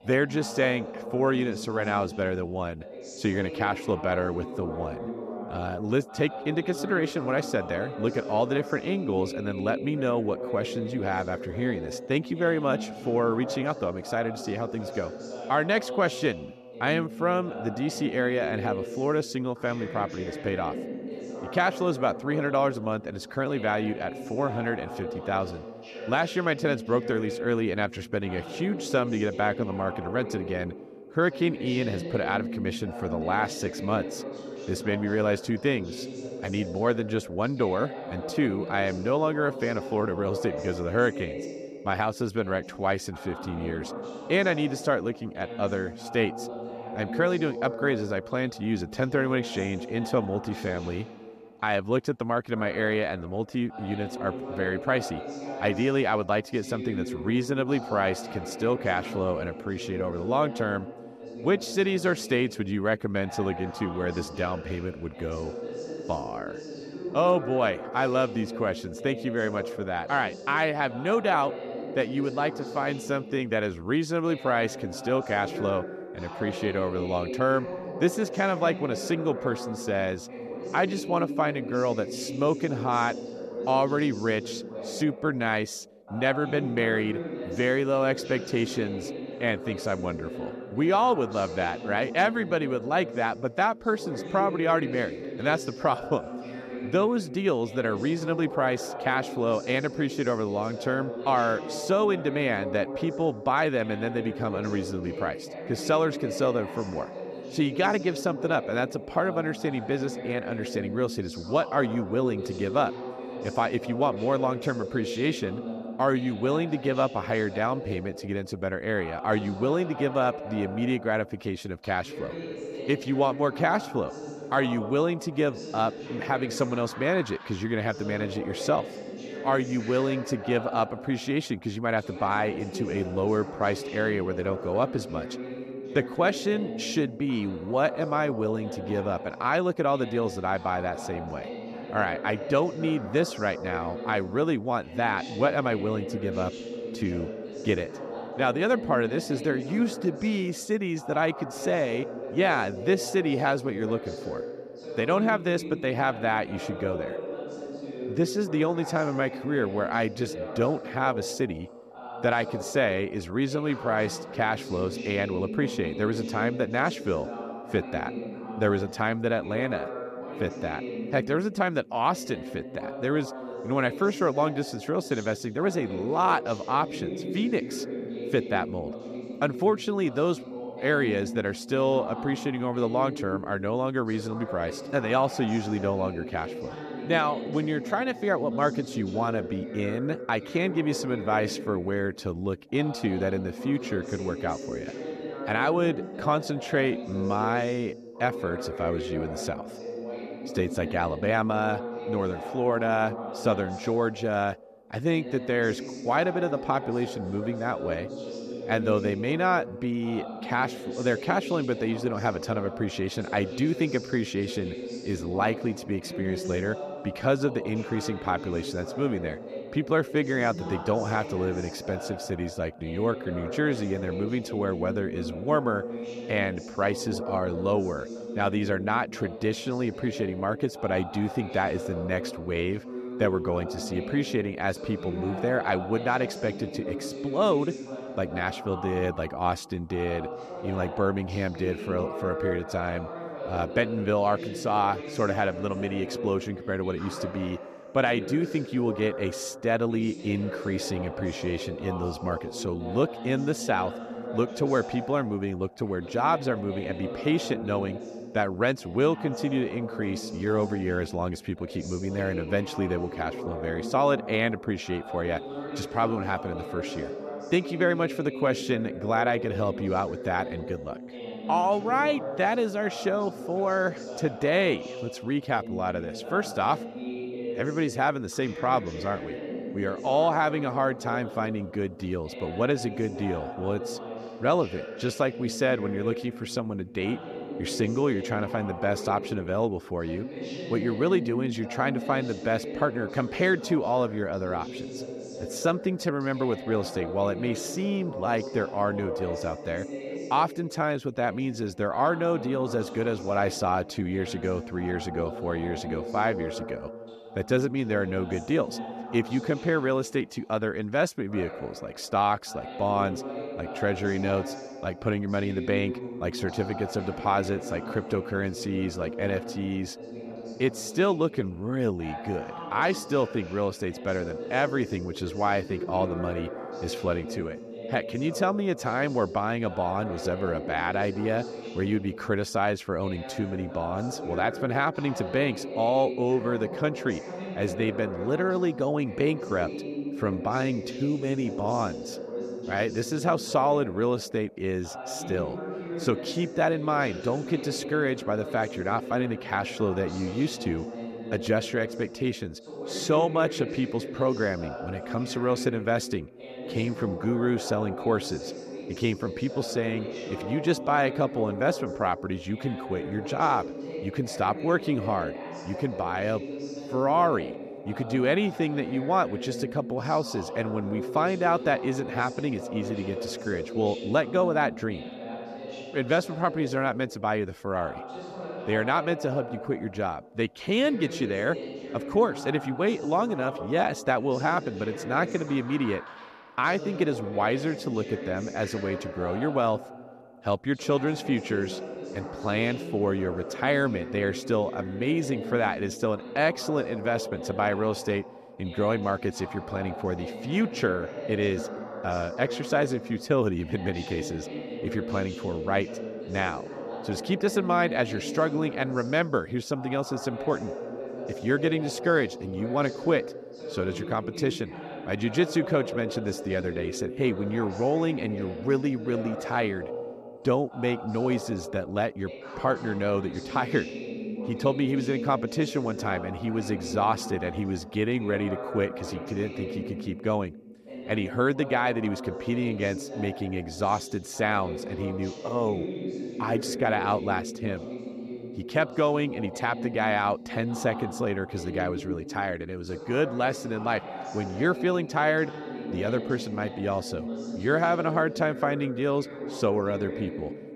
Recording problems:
voice in the background; loud; throughout; 9 dB below the speech

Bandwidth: 14.5 kHz